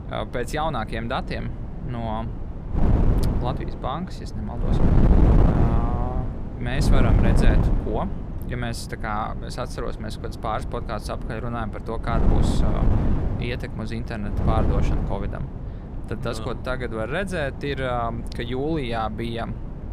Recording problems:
wind noise on the microphone; heavy; 5 dB below the speech

